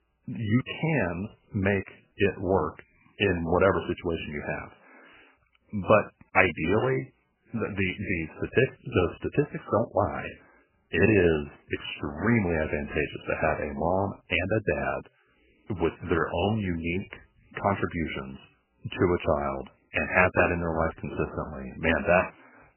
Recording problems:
garbled, watery; badly; nothing above 3 kHz

